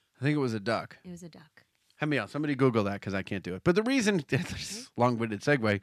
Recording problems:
none

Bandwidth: 14 kHz